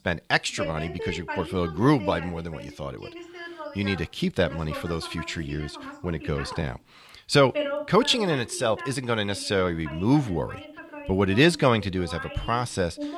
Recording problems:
voice in the background; noticeable; throughout; 10 dB below the speech

